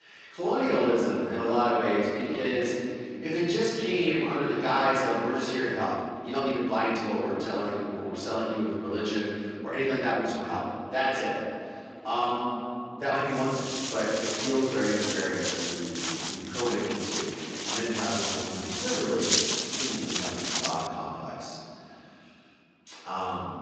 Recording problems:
room echo; strong; dies away in 3 s
off-mic speech; far
garbled, watery; slightly; nothing above 7.5 kHz
thin; very slightly; fading below 1 kHz
uneven, jittery; strongly; from 2 to 21 s
footsteps; loud; from 14 to 21 s; peak 6 dB above the speech

